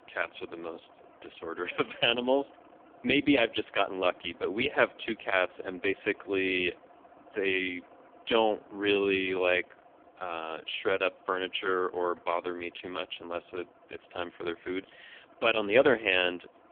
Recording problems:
phone-call audio; poor line; nothing above 3.5 kHz
traffic noise; faint; throughout; 25 dB below the speech

